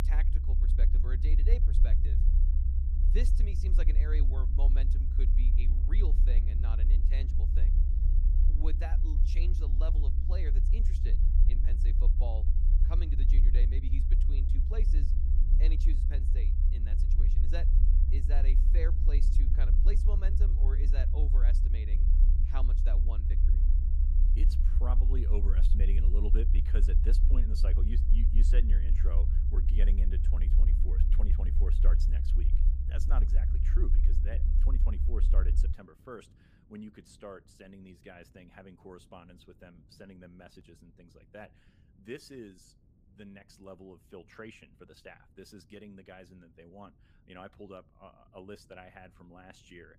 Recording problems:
low rumble; loud; until 36 s; 2 dB below the speech
wind noise on the microphone; occasional gusts; 20 dB below the speech

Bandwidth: 15 kHz